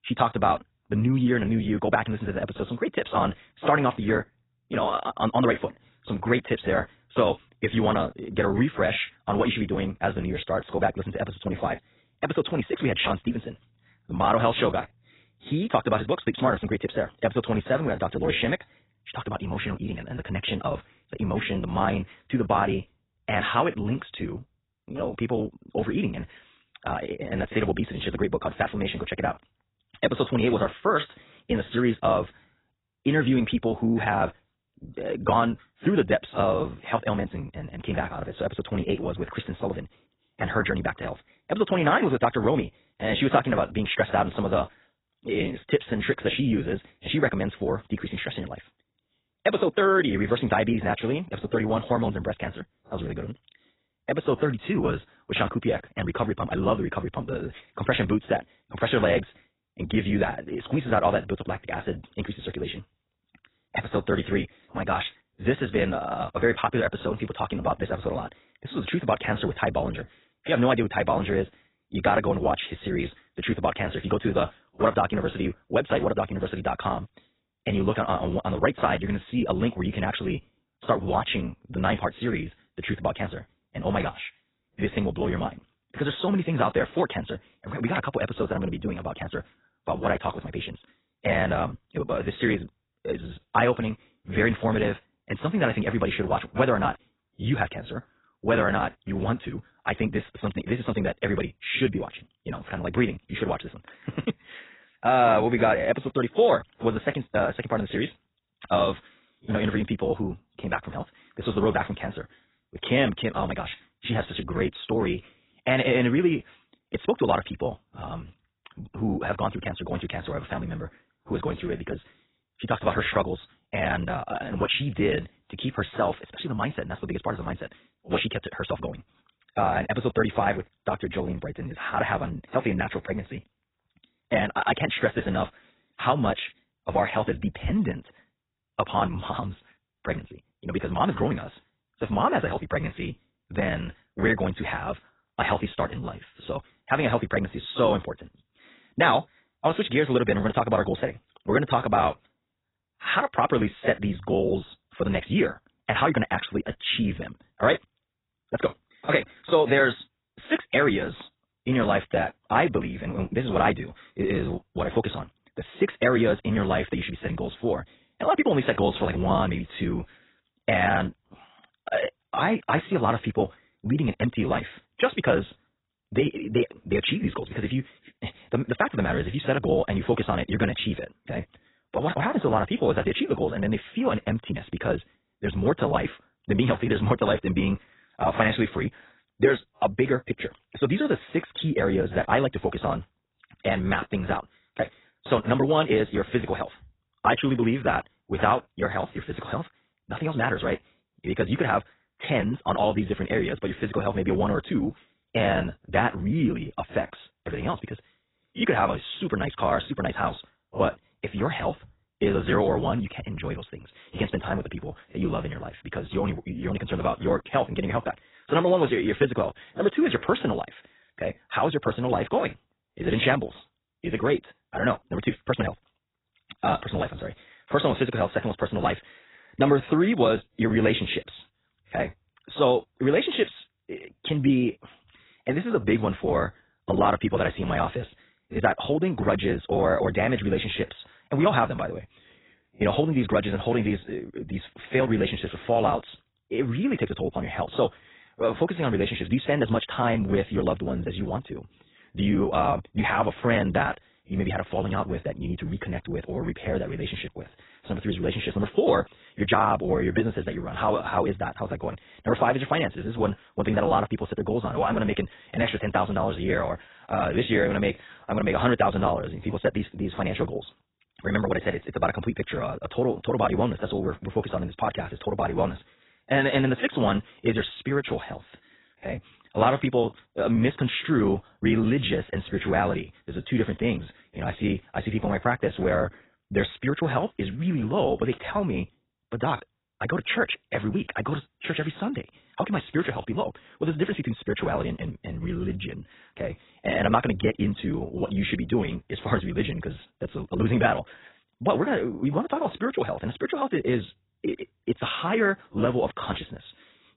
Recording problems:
garbled, watery; badly; nothing above 4 kHz
wrong speed, natural pitch; too fast; 1.5 times normal speed

